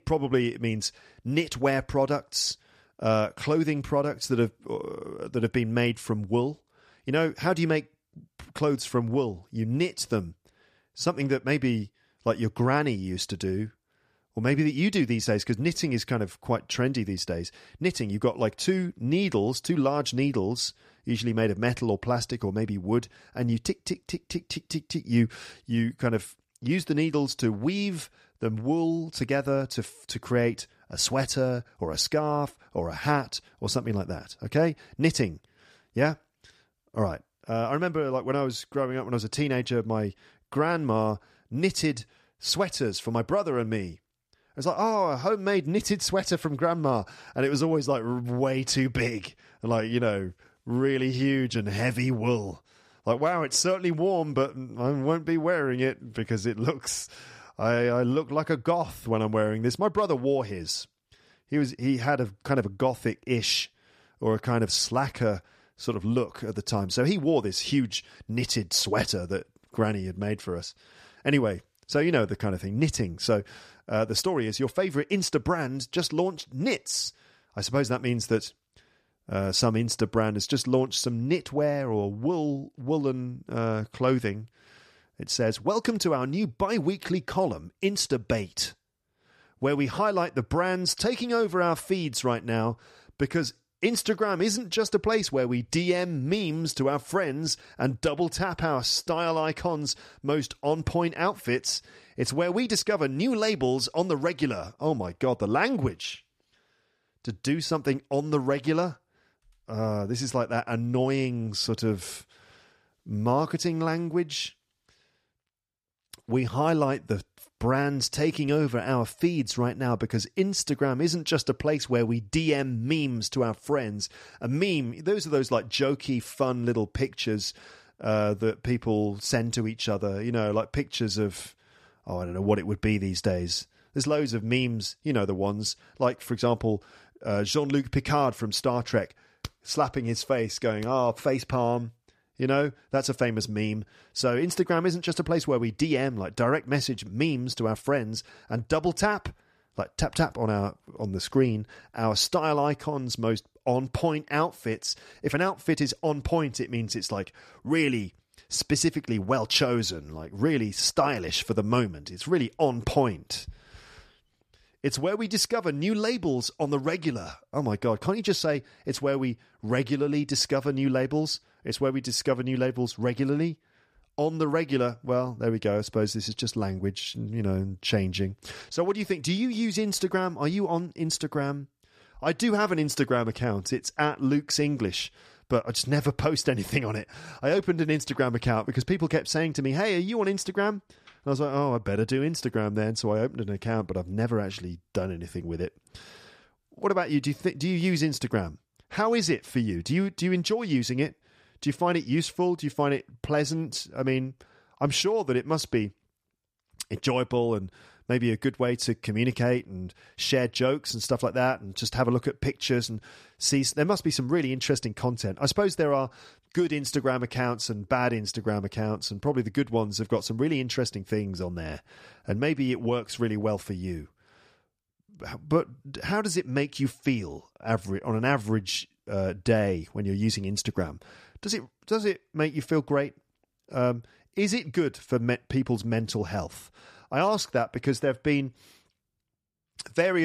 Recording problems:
abrupt cut into speech; at the end

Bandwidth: 14.5 kHz